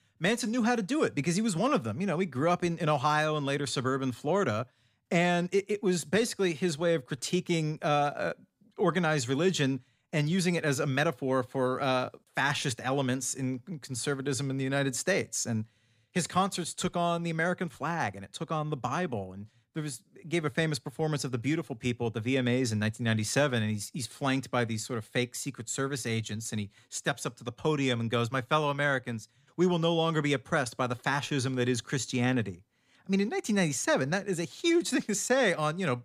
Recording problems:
none

